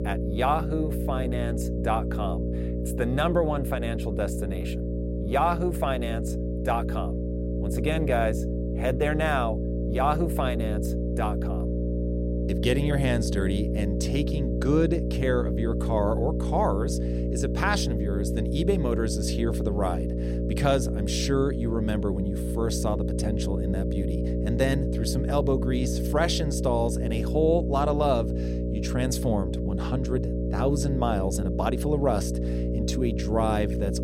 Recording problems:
electrical hum; loud; throughout; 60 Hz, 6 dB below the speech

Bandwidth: 16 kHz